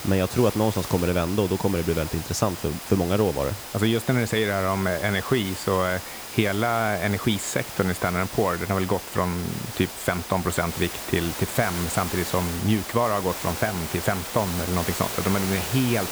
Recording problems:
hiss; loud; throughout; 8 dB below the speech
high-pitched whine; faint; throughout; 5 kHz, 25 dB below the speech

